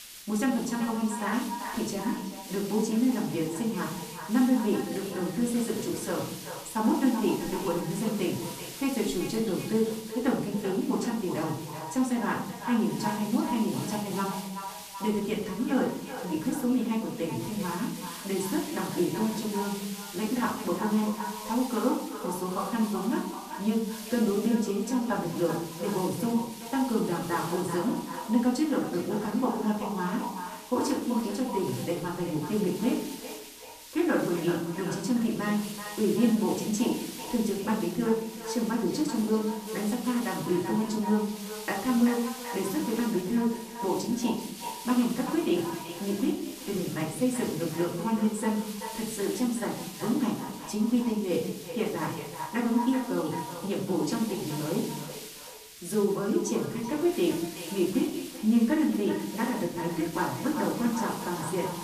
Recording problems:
echo of what is said; strong; throughout; 380 ms later, 10 dB below the speech
off-mic speech; far
room echo; slight; dies away in 0.7 s
hiss; noticeable; throughout; 15 dB below the speech

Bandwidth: 14.5 kHz